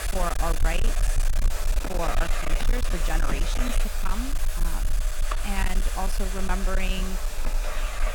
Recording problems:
distortion; slight; 17% of the sound clipped
household noises; loud; throughout; 1 dB below the speech
low rumble; loud; throughout; 8 dB below the speech

